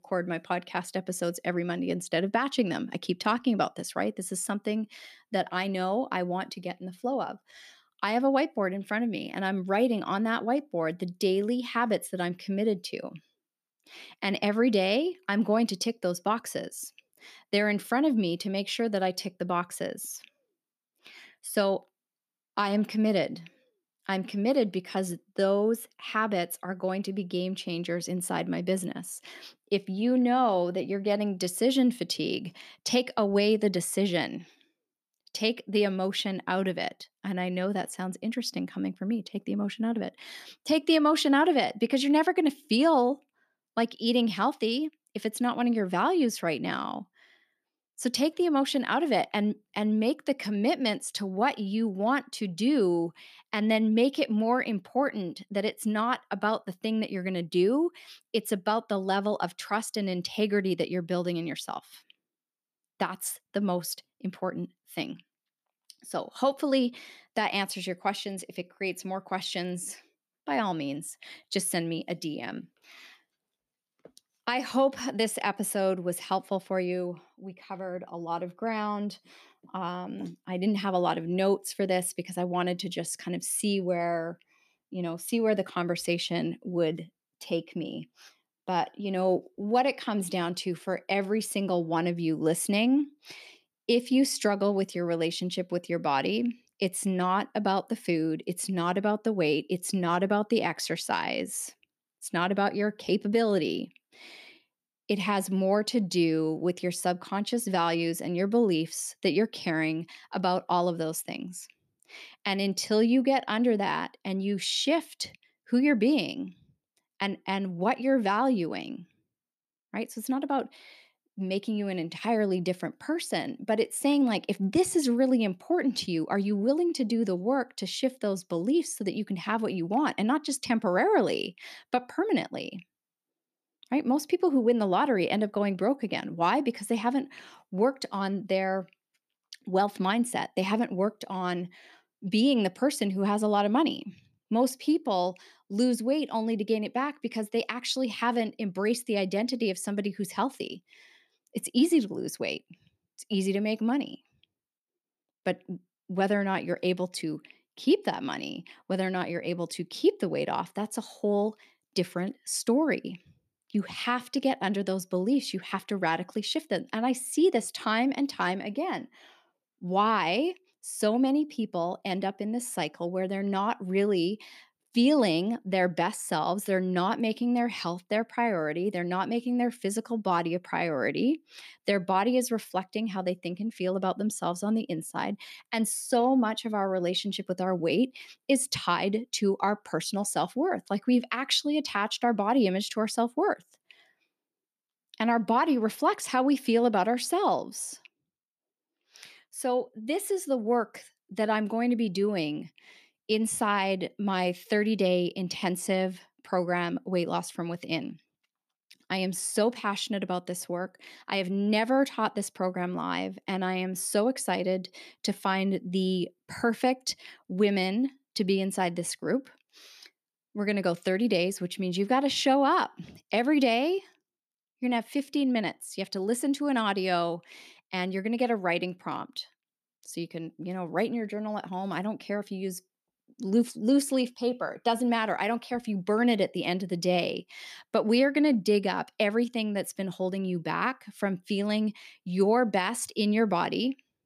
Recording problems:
none

